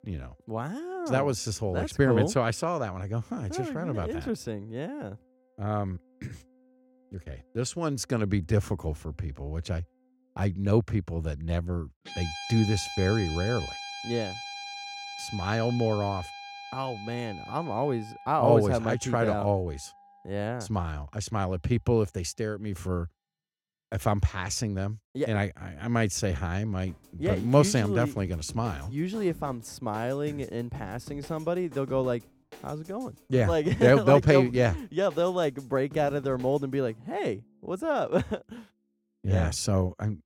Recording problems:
background music; noticeable; throughout; 15 dB below the speech

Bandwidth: 16.5 kHz